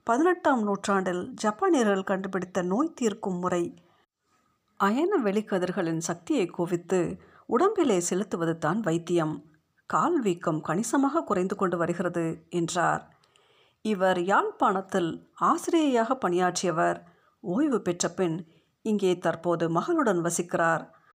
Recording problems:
none

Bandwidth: 15 kHz